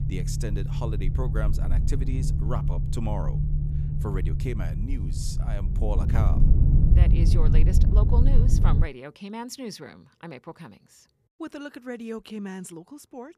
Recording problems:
low rumble; loud; until 9 s; 1 dB below the speech

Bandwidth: 14.5 kHz